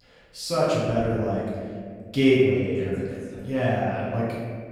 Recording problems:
room echo; strong; dies away in 1.9 s
off-mic speech; far

